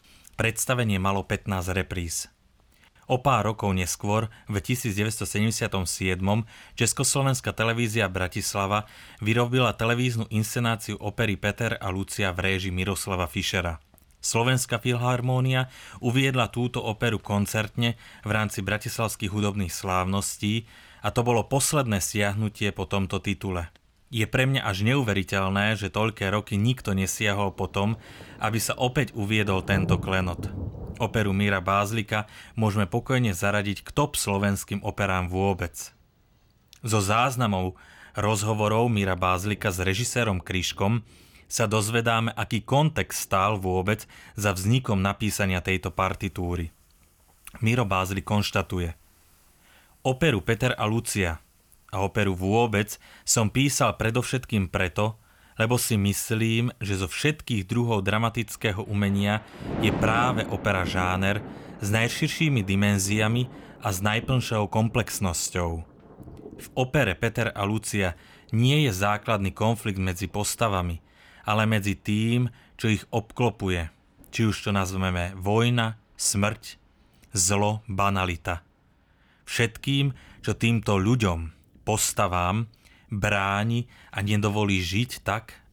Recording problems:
rain or running water; noticeable; throughout; 15 dB below the speech

